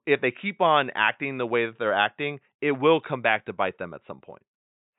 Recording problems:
high frequencies cut off; severe; nothing above 4 kHz

